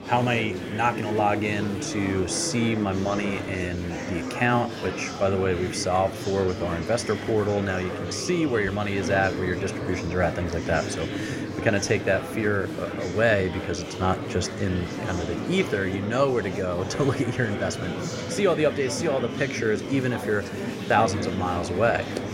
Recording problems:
murmuring crowd; loud; throughout; 6 dB below the speech

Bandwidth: 16 kHz